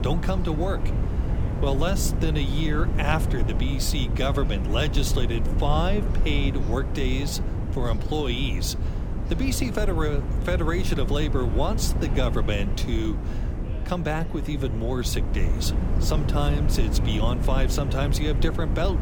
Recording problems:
wind noise on the microphone; heavy; 8 dB below the speech
background chatter; noticeable; throughout; 4 voices, 20 dB below the speech

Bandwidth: 18 kHz